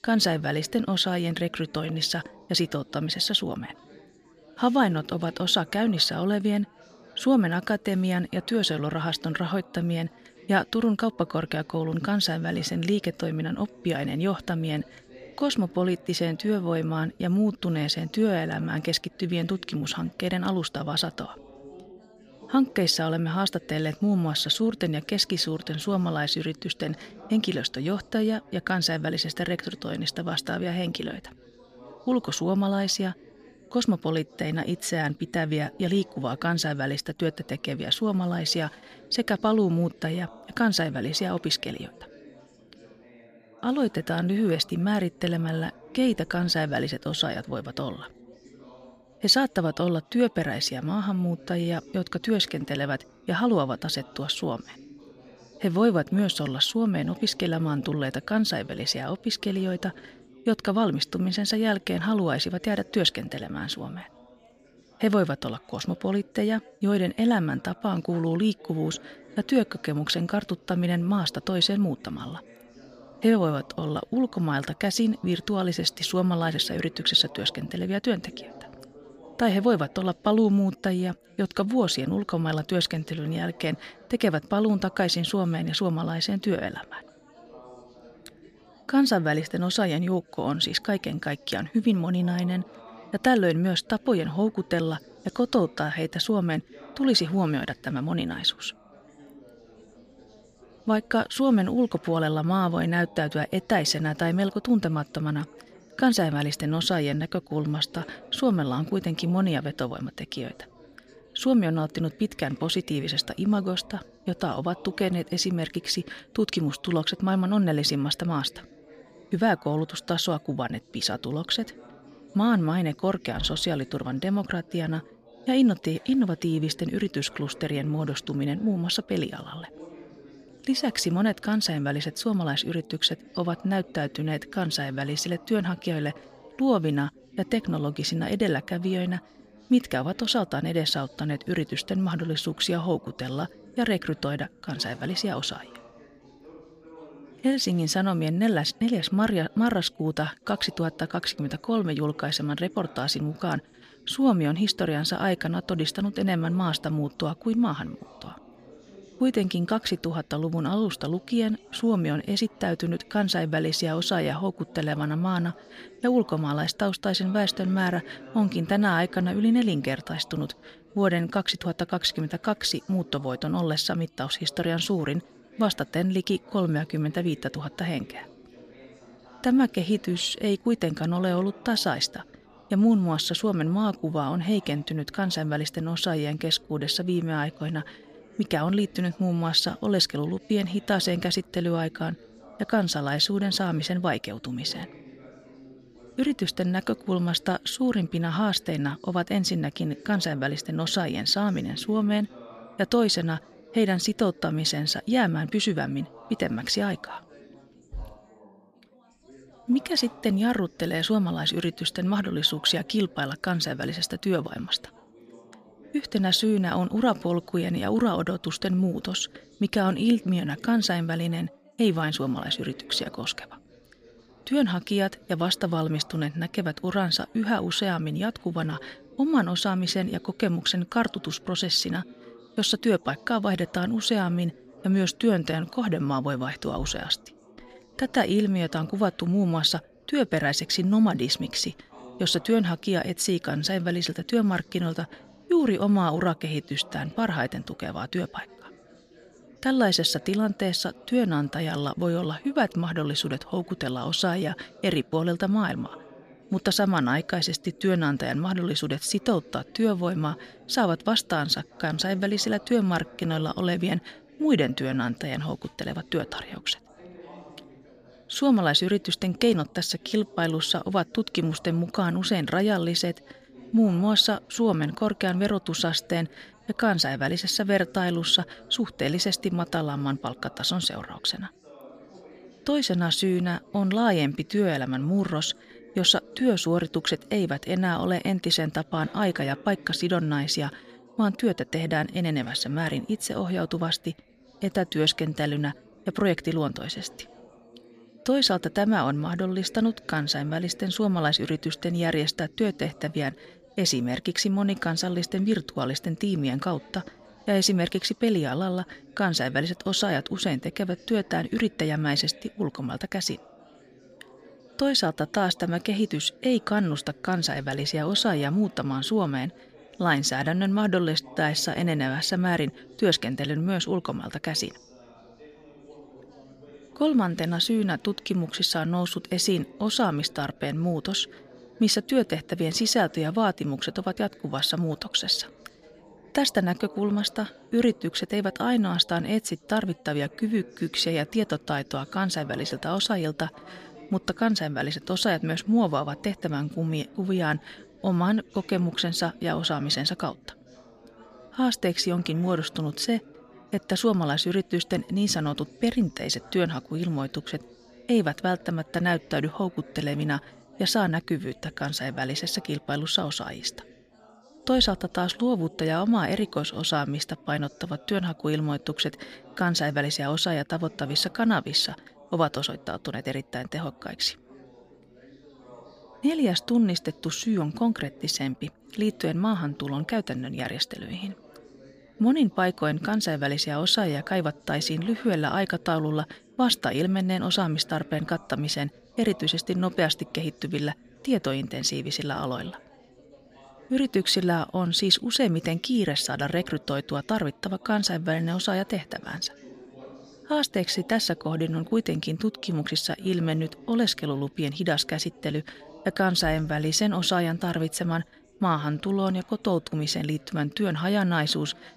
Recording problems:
background chatter; faint; throughout; 4 voices, 25 dB below the speech

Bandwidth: 15 kHz